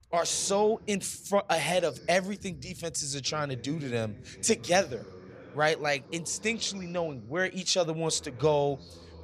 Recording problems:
voice in the background; faint; throughout; 20 dB below the speech

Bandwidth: 15 kHz